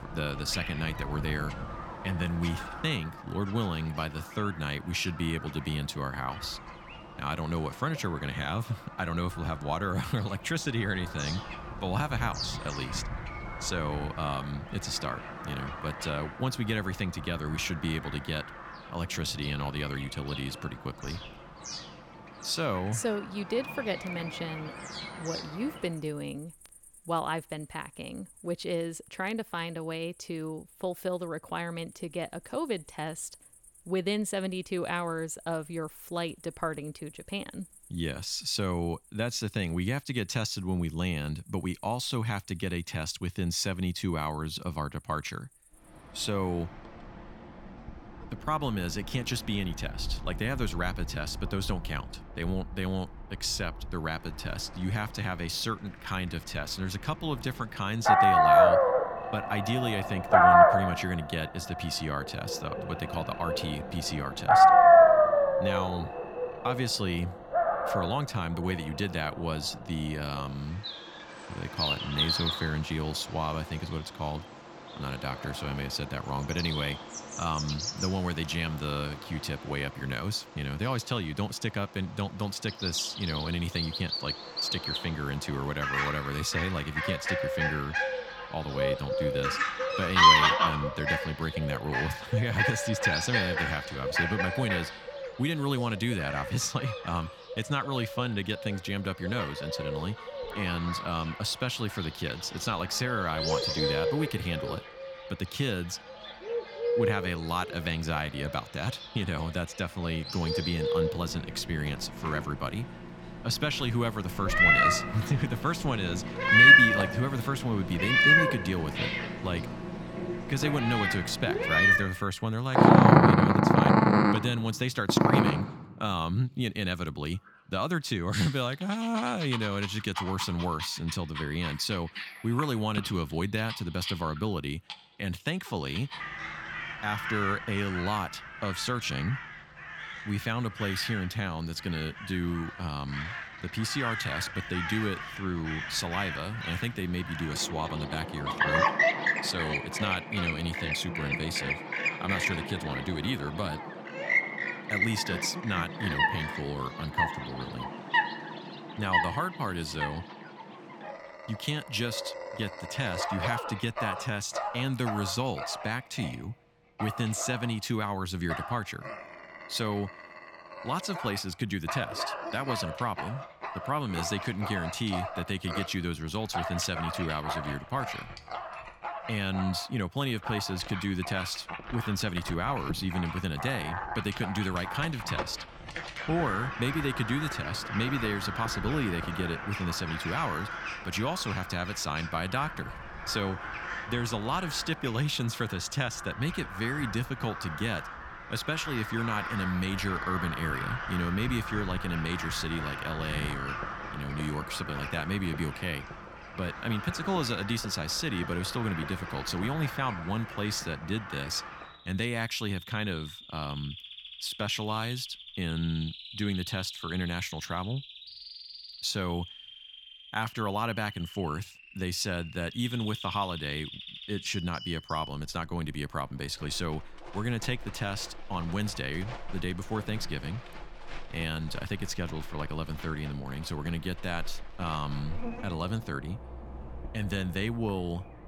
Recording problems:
animal sounds; very loud; throughout; 4 dB above the speech

